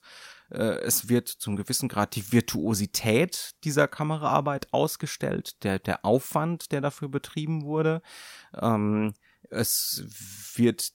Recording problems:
none

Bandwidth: 16.5 kHz